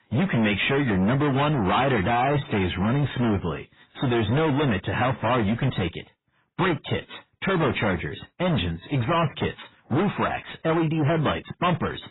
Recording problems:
distortion; heavy; 25% of the sound clipped
garbled, watery; badly; nothing above 4 kHz

